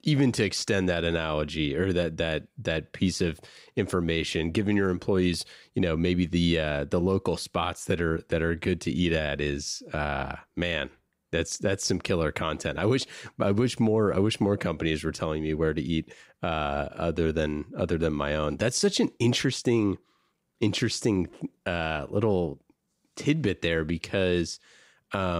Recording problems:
abrupt cut into speech; at the end

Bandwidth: 15.5 kHz